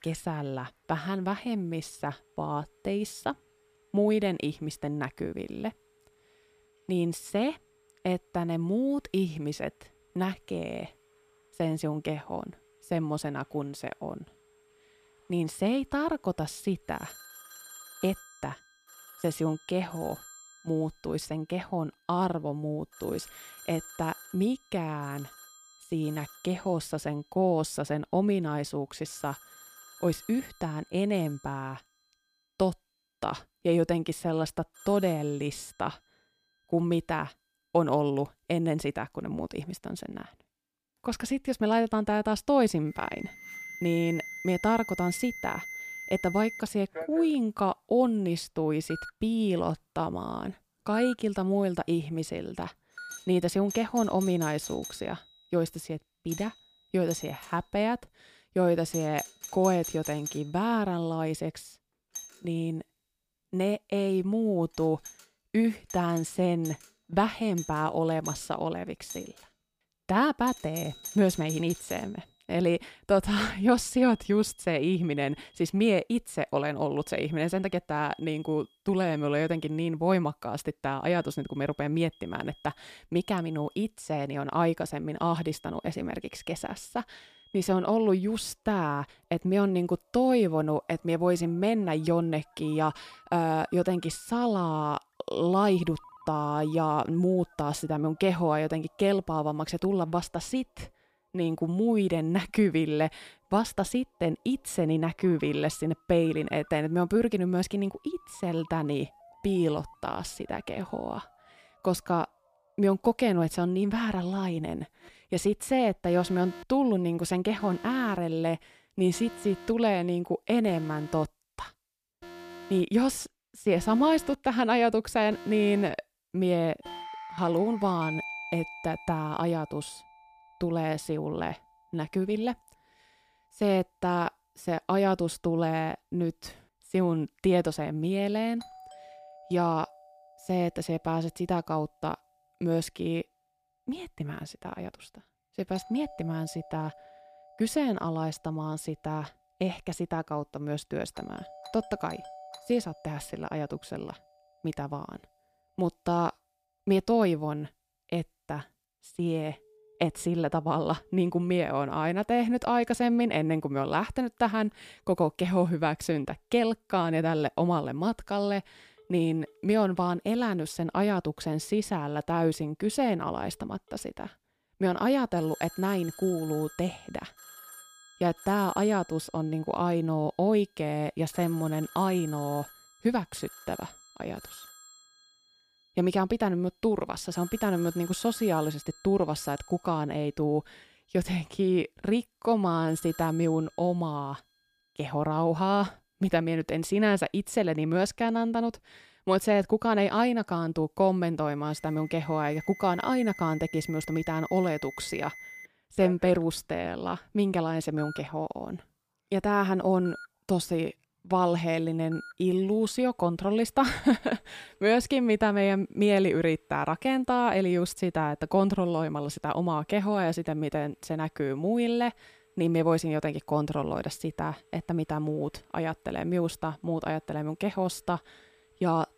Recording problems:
alarms or sirens; noticeable; throughout; 15 dB below the speech

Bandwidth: 15 kHz